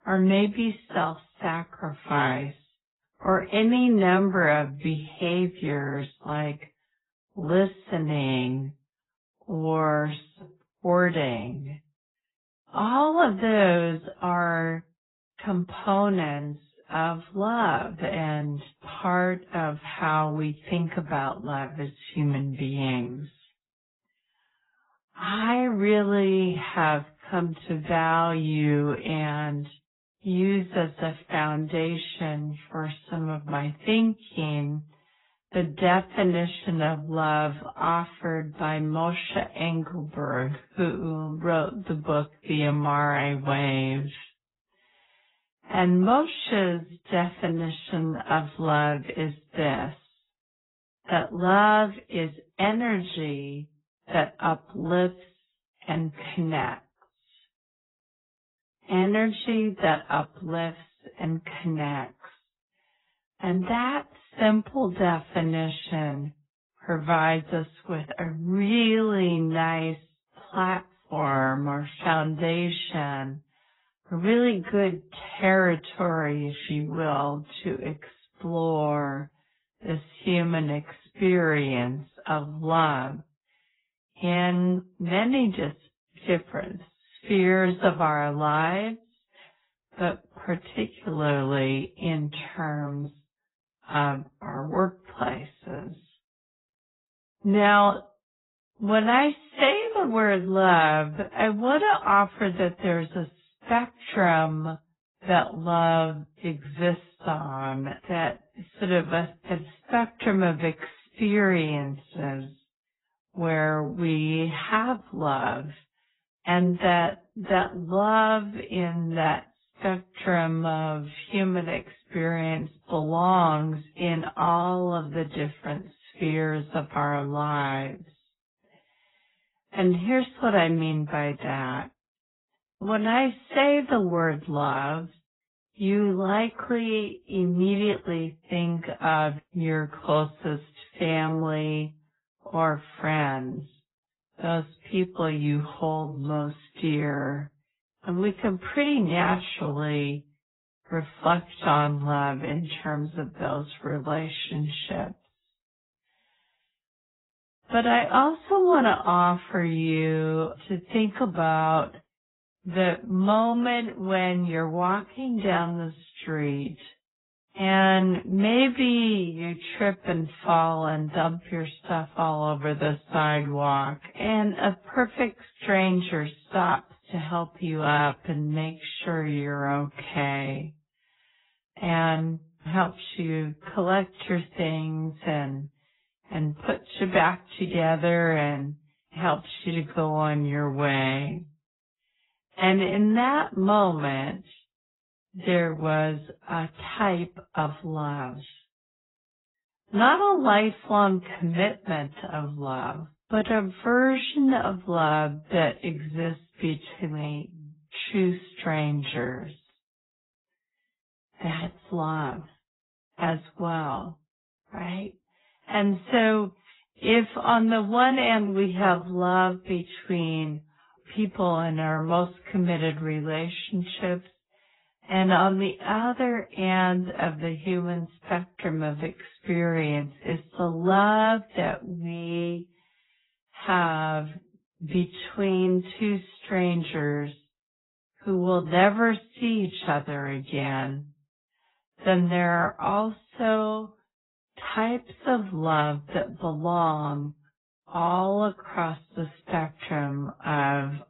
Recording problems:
garbled, watery; badly; nothing above 4 kHz
wrong speed, natural pitch; too slow; 0.6 times normal speed

